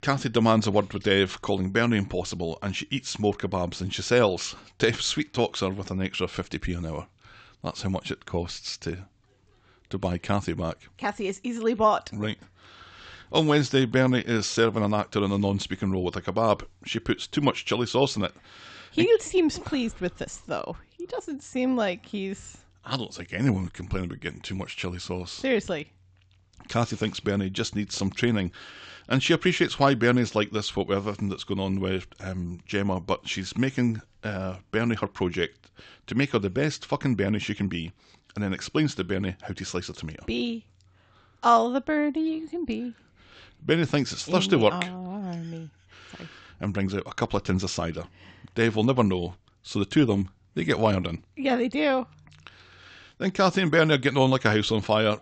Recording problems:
high frequencies cut off; noticeable; nothing above 8 kHz

